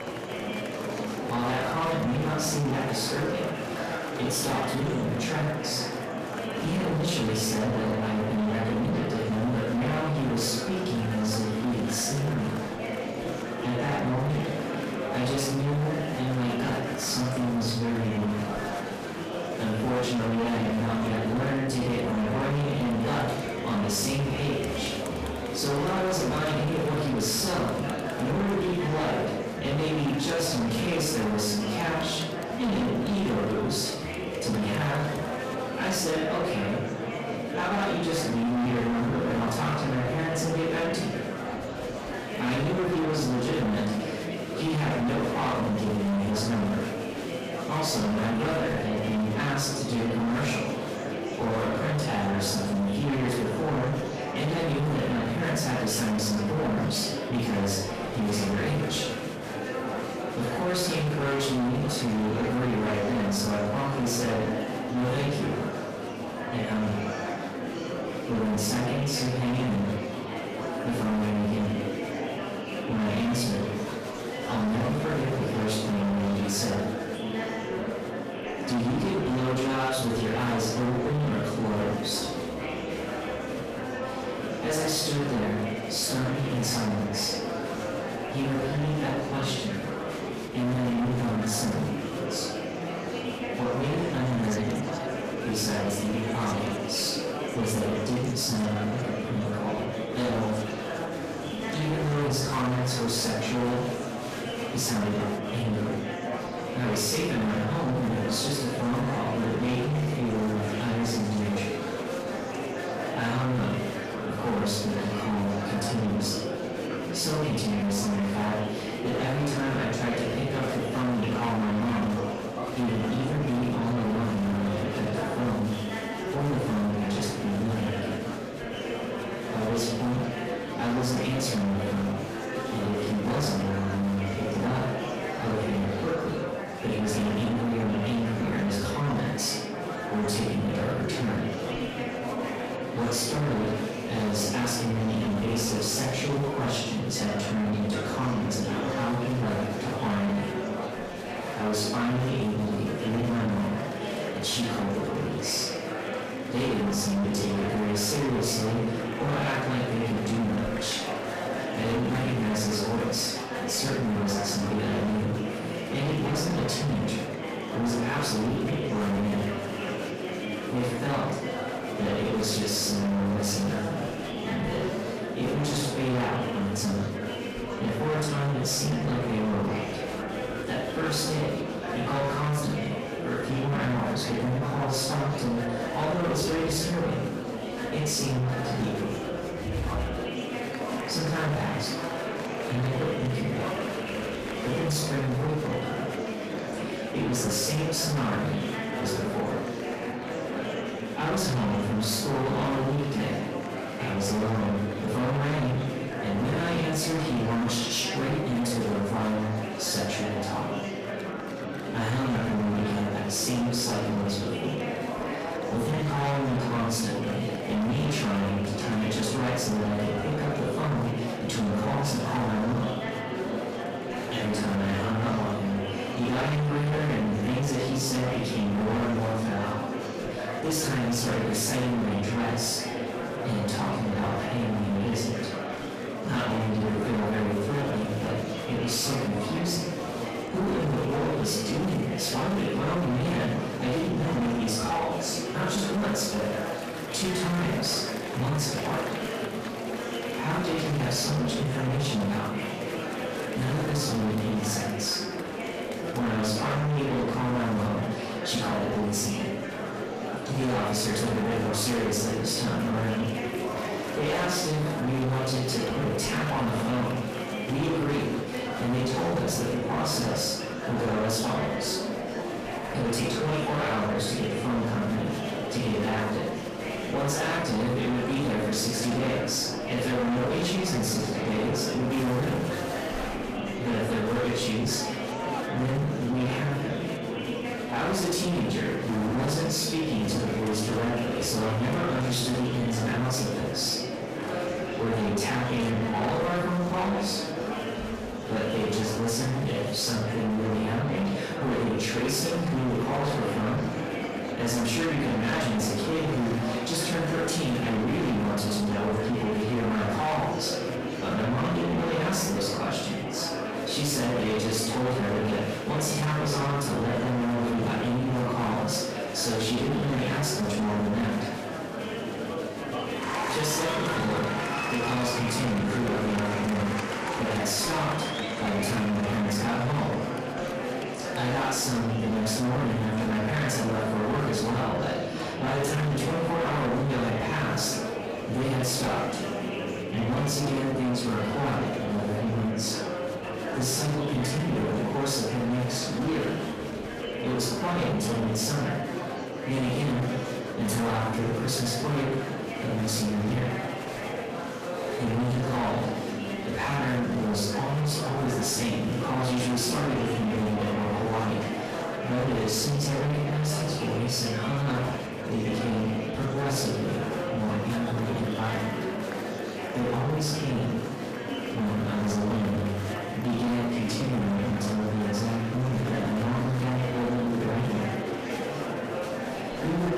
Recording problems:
distortion; heavy; 27% of the sound clipped
off-mic speech; far
room echo; noticeable; dies away in 0.7 s
murmuring crowd; loud; throughout; 5 dB below the speech
background music; faint; from 4:23 on; 20 dB below the speech

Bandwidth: 14.5 kHz